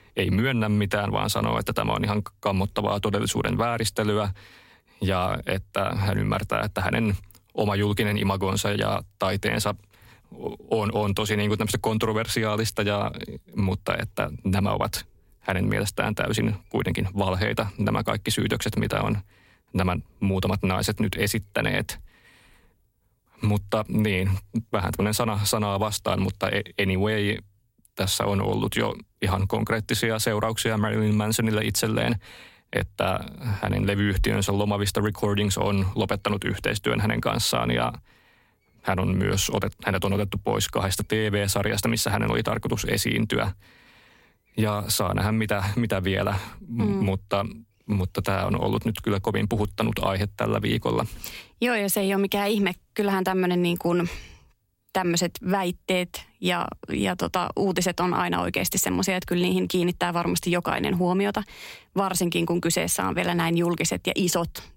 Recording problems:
squashed, flat; somewhat

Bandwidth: 16 kHz